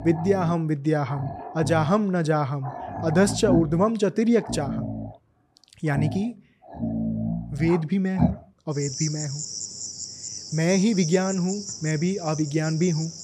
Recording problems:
animal sounds; loud; throughout; 7 dB below the speech

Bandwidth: 14.5 kHz